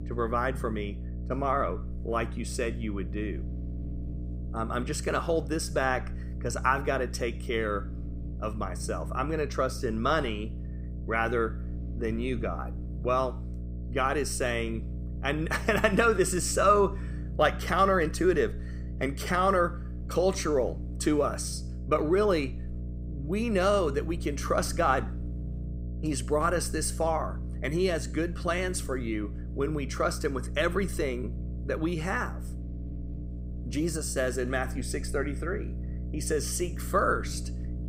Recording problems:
electrical hum; faint; throughout; 60 Hz, 20 dB below the speech

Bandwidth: 15.5 kHz